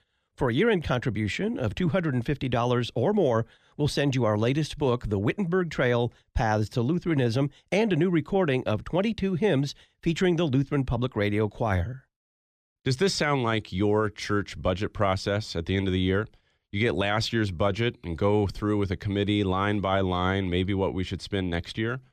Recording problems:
none

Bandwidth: 14.5 kHz